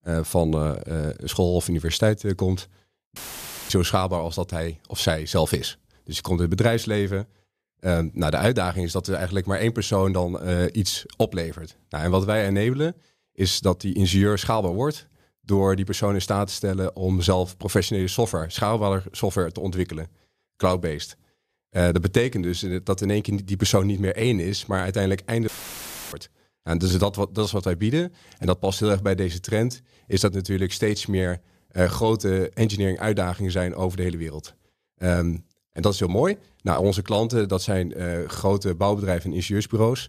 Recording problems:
audio cutting out; filled with static; at 3 s for 0.5 s and at 25 s for 0.5 s

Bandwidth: 14.5 kHz